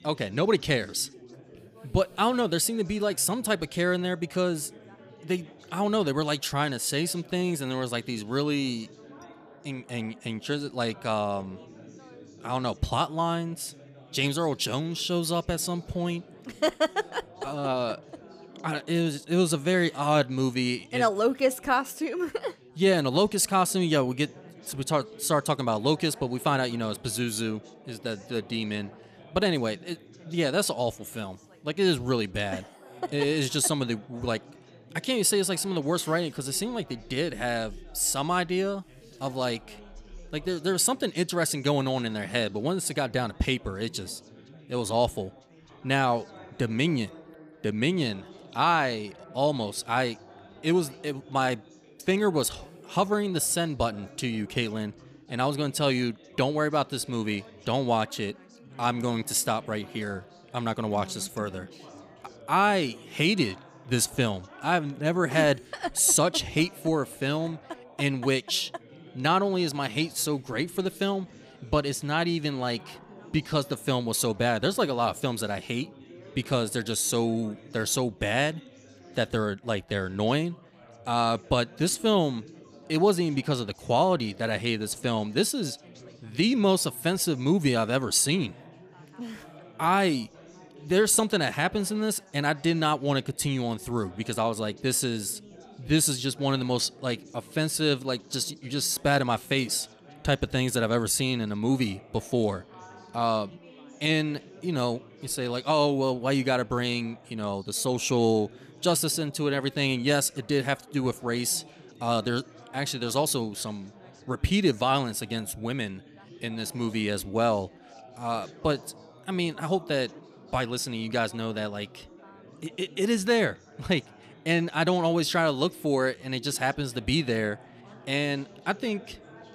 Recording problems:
background chatter; faint; throughout; 4 voices, 25 dB below the speech

